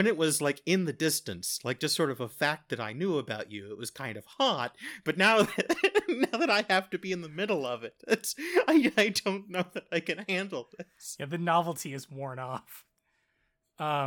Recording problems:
abrupt cut into speech; at the start and the end

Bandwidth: 18 kHz